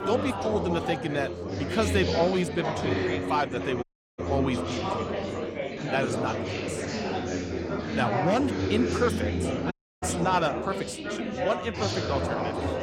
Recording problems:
chatter from many people; loud; throughout; as loud as the speech
audio cutting out; at 4 s and at 9.5 s

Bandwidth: 17 kHz